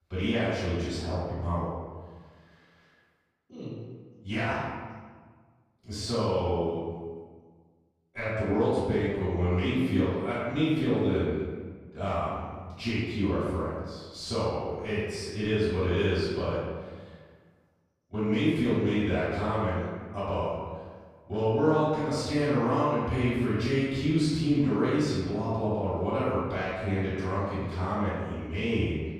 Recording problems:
room echo; strong; dies away in 1.3 s
off-mic speech; far

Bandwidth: 15 kHz